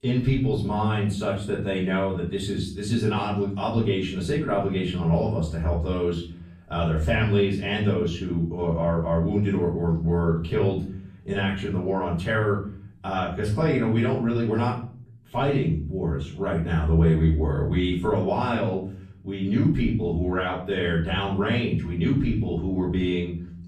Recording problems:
off-mic speech; far
room echo; slight; dies away in 0.5 s

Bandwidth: 14.5 kHz